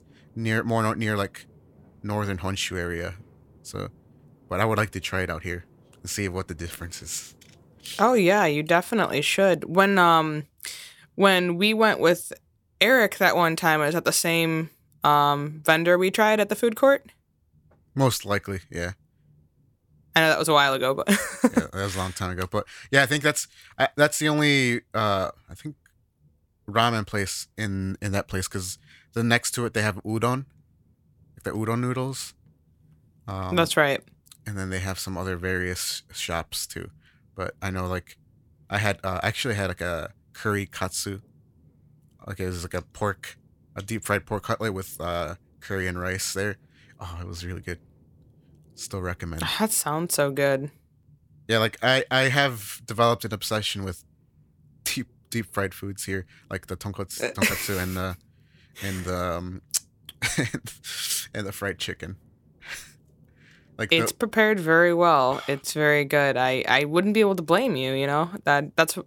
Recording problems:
none

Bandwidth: 17 kHz